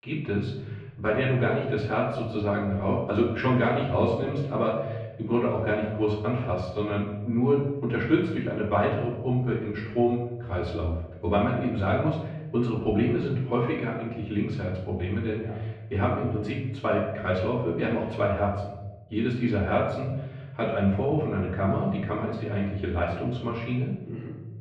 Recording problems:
off-mic speech; far
muffled; very; fading above 2.5 kHz
room echo; noticeable; dies away in 1 s

